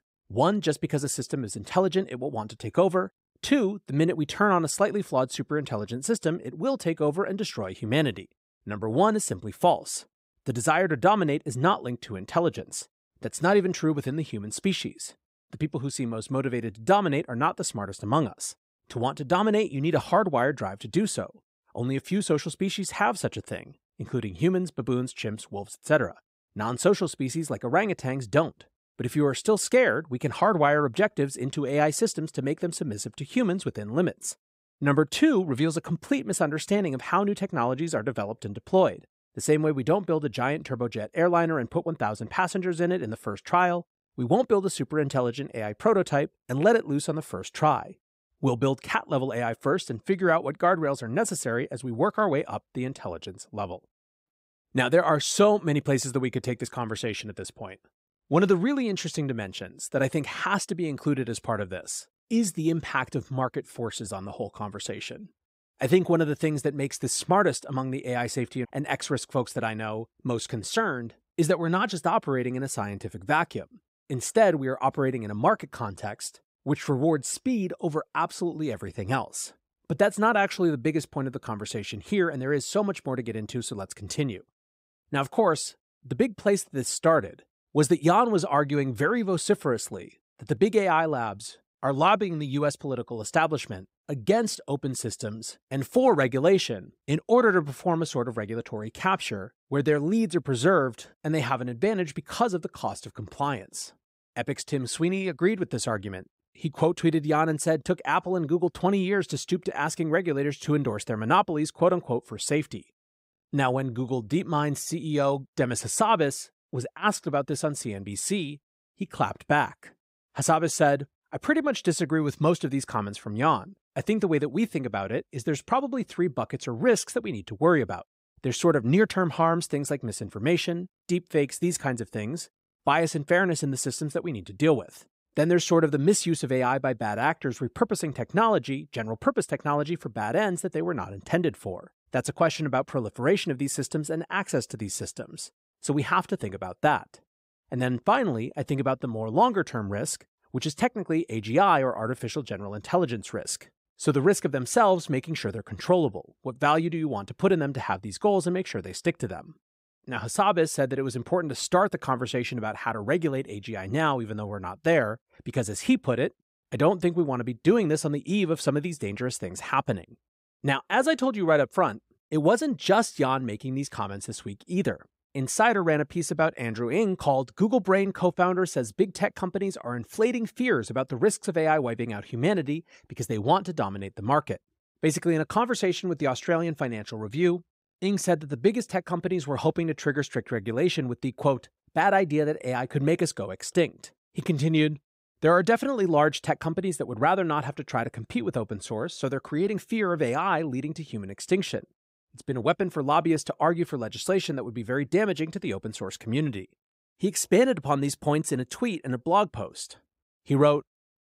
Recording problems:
none

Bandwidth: 15.5 kHz